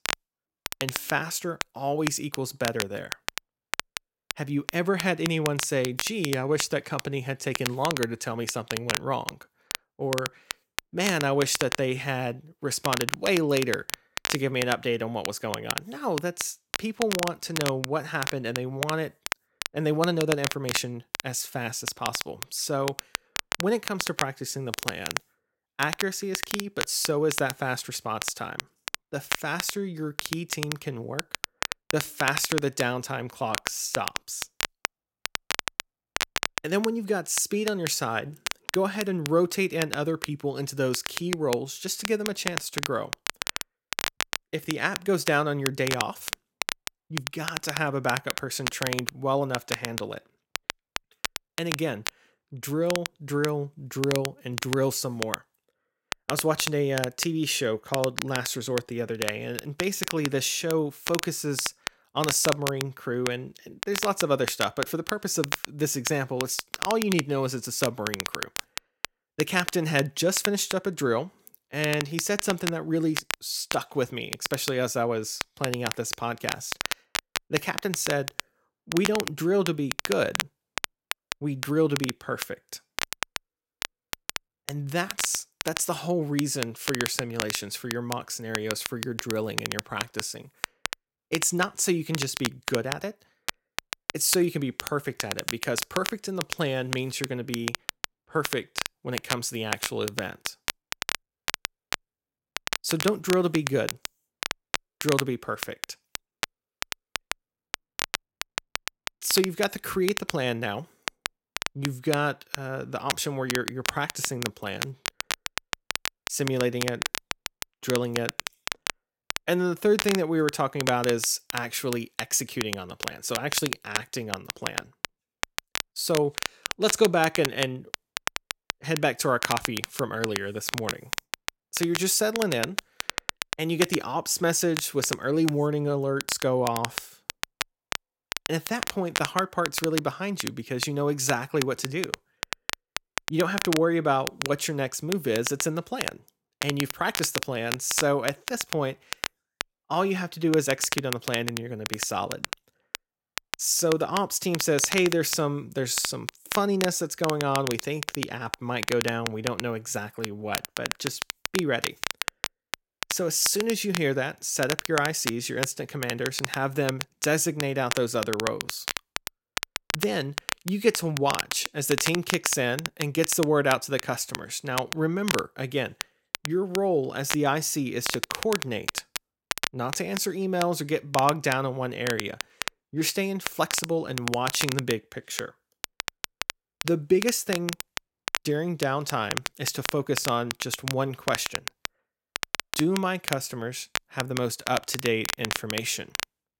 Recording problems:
crackle, like an old record; loud; 5 dB below the speech

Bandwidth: 16.5 kHz